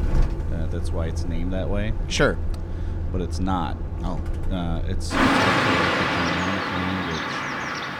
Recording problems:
traffic noise; very loud; throughout; 4 dB above the speech

